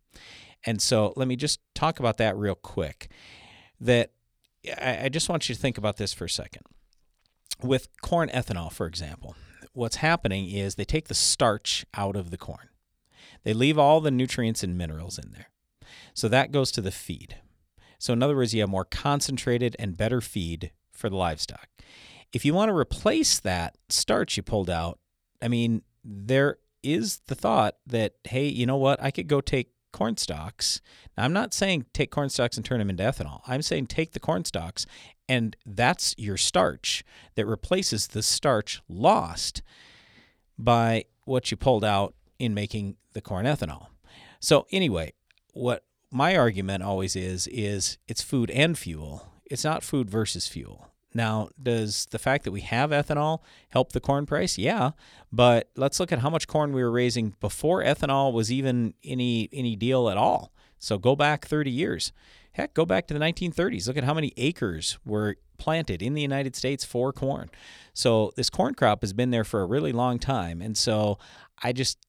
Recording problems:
none

